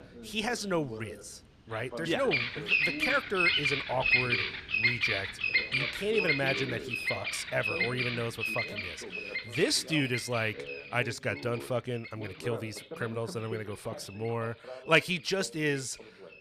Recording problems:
animal sounds; very loud; throughout; 3 dB above the speech
voice in the background; noticeable; throughout; 15 dB below the speech

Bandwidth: 15 kHz